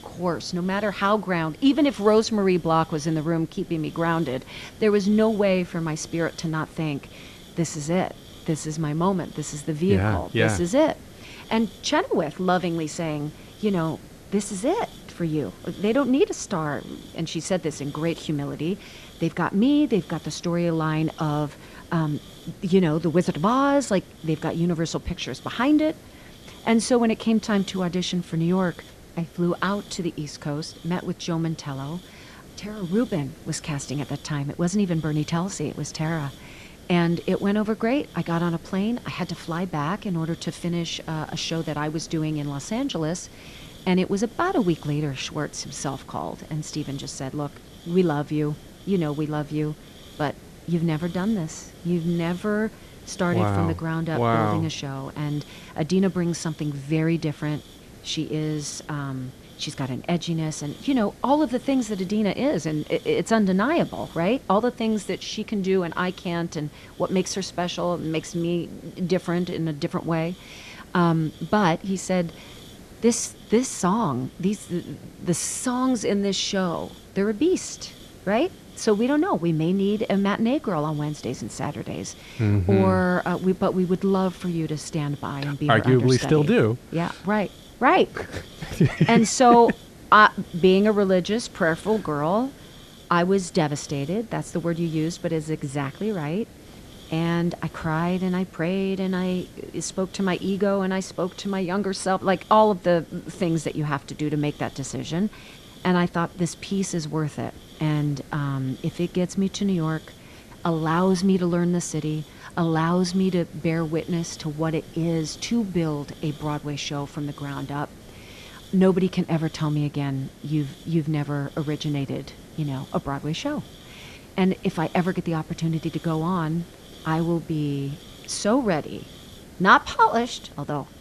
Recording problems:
hiss; faint; throughout; 20 dB below the speech

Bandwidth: 13.5 kHz